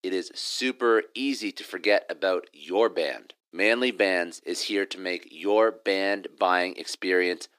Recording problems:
thin; somewhat; fading below 300 Hz

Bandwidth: 15 kHz